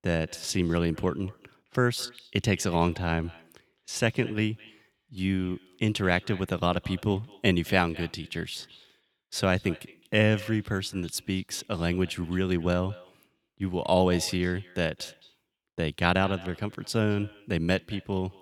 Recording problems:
echo of what is said; faint; throughout; 210 ms later, 20 dB below the speech

